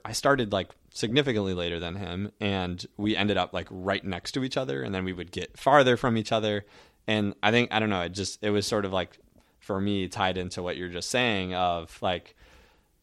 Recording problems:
none

